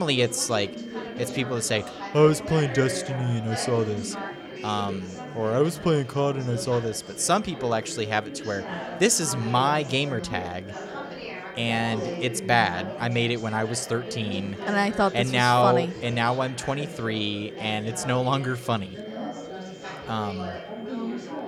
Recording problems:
chatter from many people; noticeable; throughout; 10 dB below the speech
high-pitched whine; faint; throughout; 3 kHz, 25 dB below the speech
abrupt cut into speech; at the start

